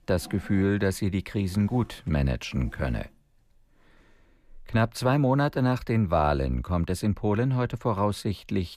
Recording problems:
household noises; faint; throughout; 25 dB below the speech

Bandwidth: 14.5 kHz